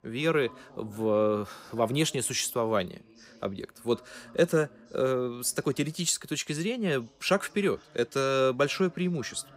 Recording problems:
voice in the background; faint; throughout; 25 dB below the speech

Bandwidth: 15.5 kHz